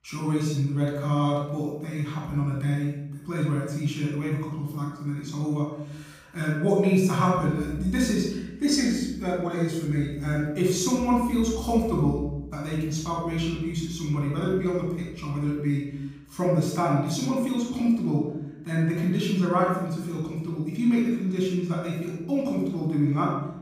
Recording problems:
off-mic speech; far
room echo; noticeable; dies away in 0.8 s

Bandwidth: 15.5 kHz